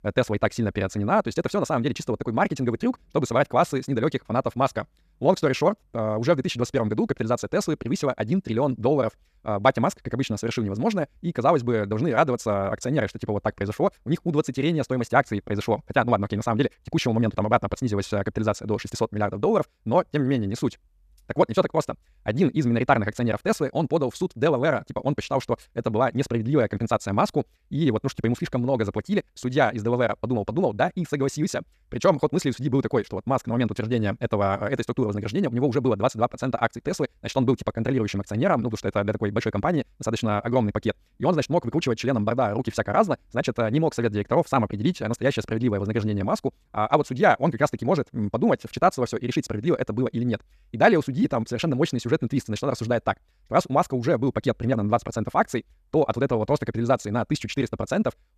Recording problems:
wrong speed, natural pitch; too fast; 1.6 times normal speed

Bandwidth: 14.5 kHz